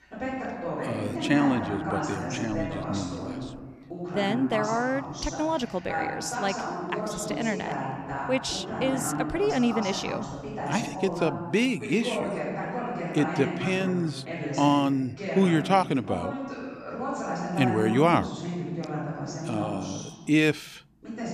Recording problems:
voice in the background; loud; throughout; 5 dB below the speech

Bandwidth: 14.5 kHz